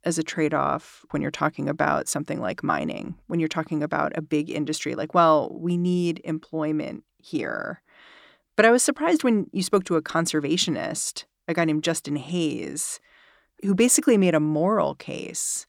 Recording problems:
none

